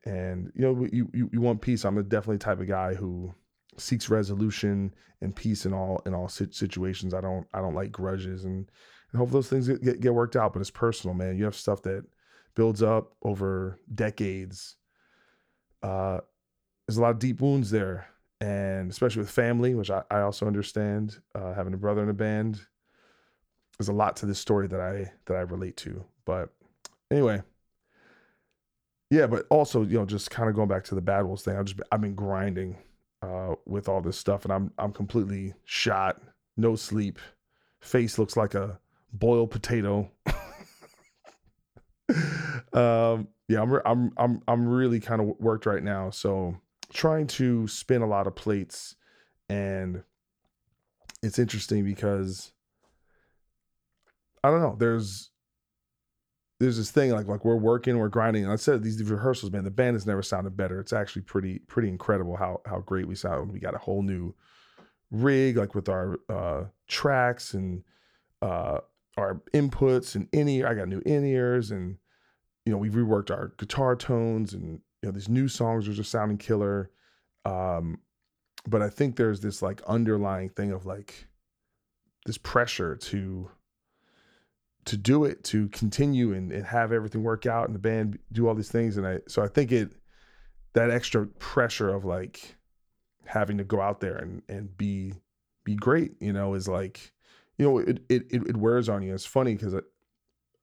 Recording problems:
none

